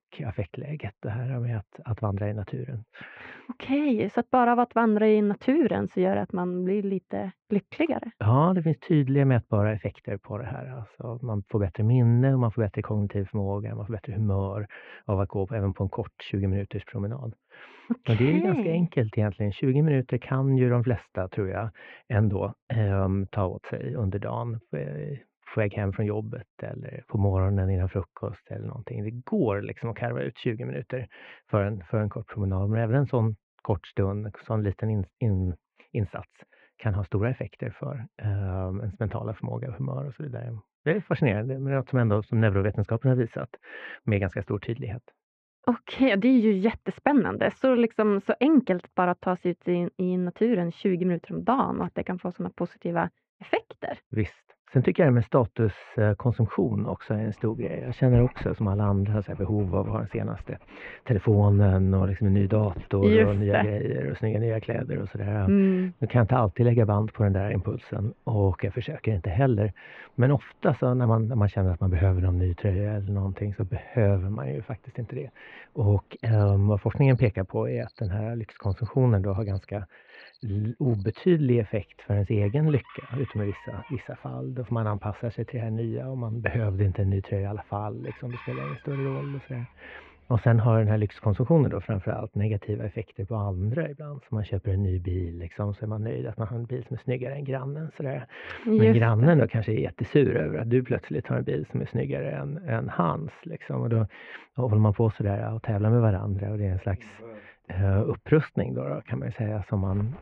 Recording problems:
muffled; very; fading above 2.5 kHz
animal sounds; faint; from 57 s on; 20 dB below the speech

